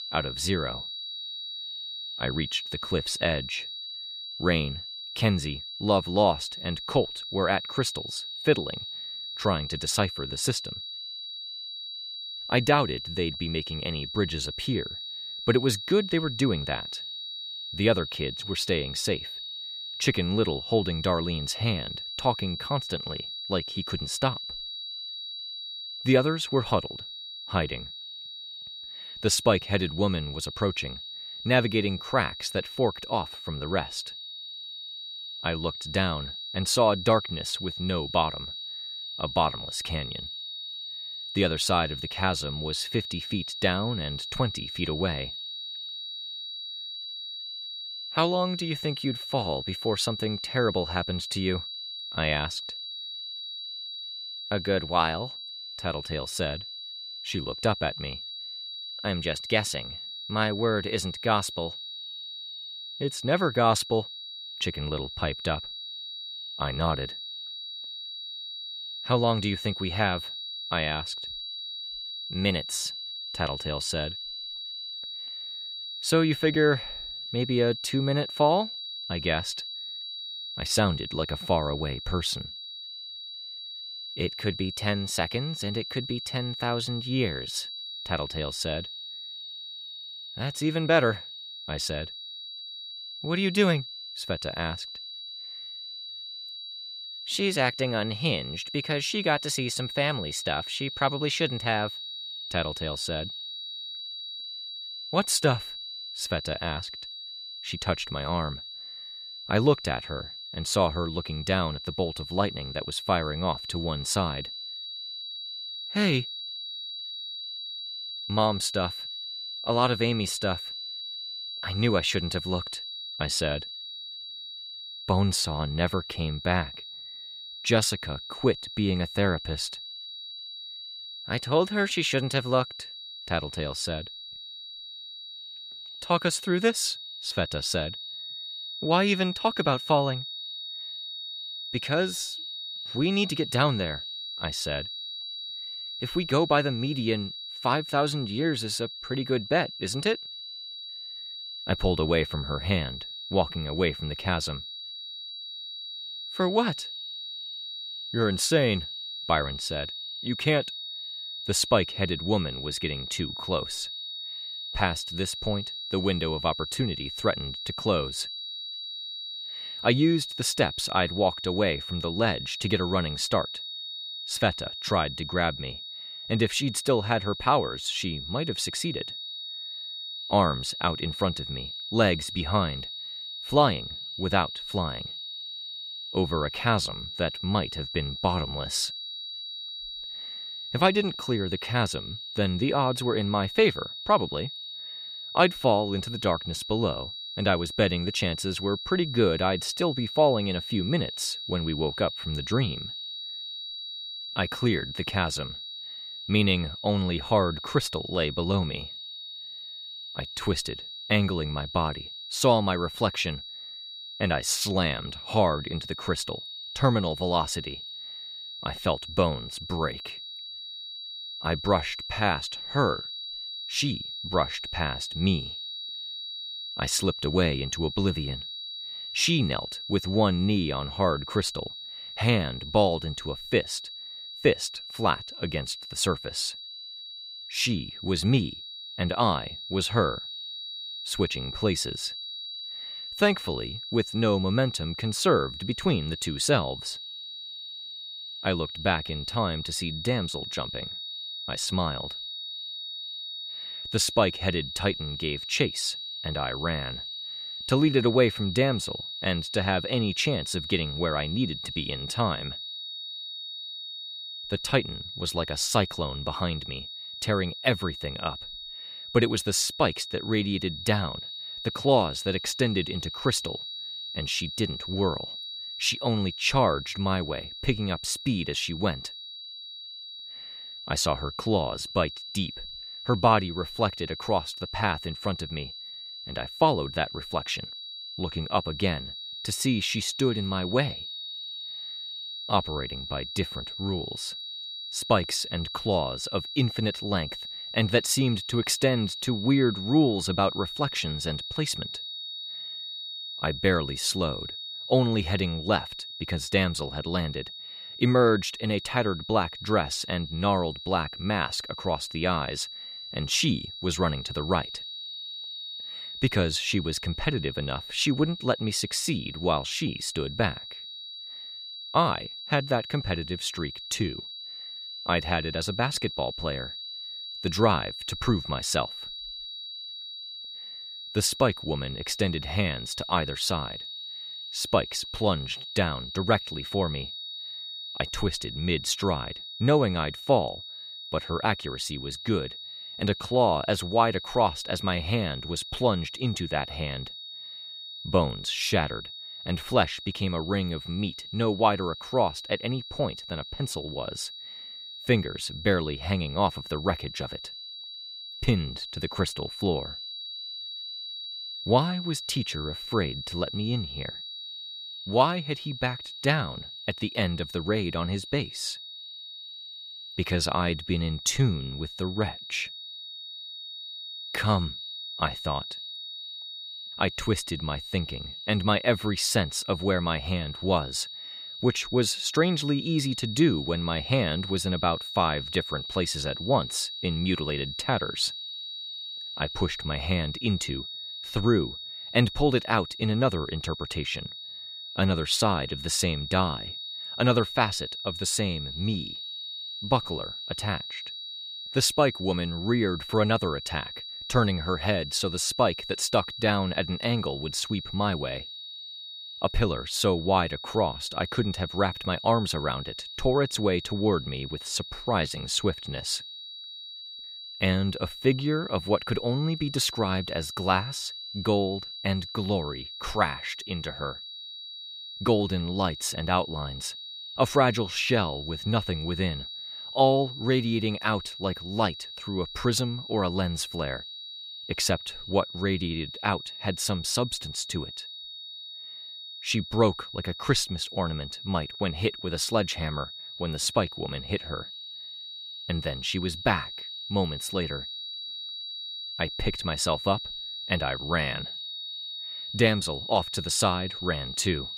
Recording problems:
high-pitched whine; loud; throughout; 4 kHz, 8 dB below the speech

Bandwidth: 15 kHz